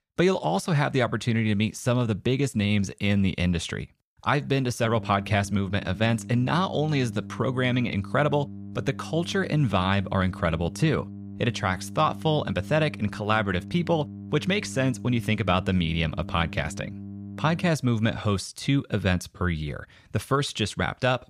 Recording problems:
electrical hum; noticeable; from 5 to 18 s; 50 Hz, 20 dB below the speech

